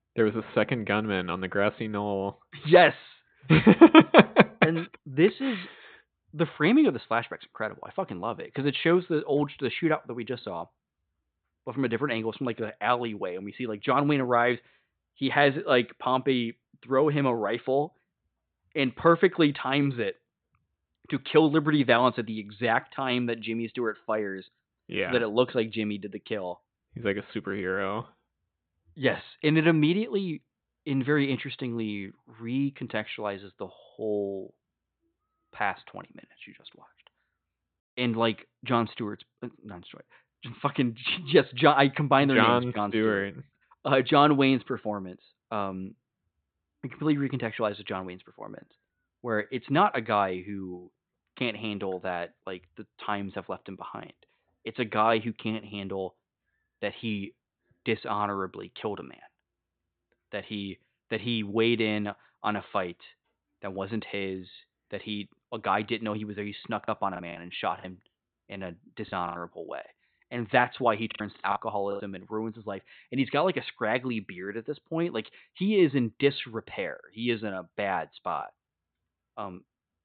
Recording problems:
high frequencies cut off; severe; nothing above 4 kHz
choppy; very; from 1:07 to 1:09 and at 1:11; 15% of the speech affected

